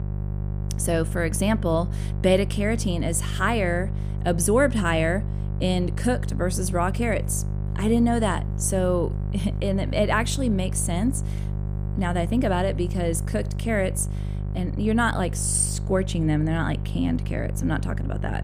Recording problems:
electrical hum; noticeable; throughout; 50 Hz, 15 dB below the speech

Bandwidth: 15 kHz